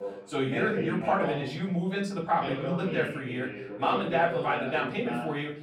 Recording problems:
off-mic speech; far
room echo; slight; dies away in 0.4 s
voice in the background; loud; throughout; 5 dB below the speech

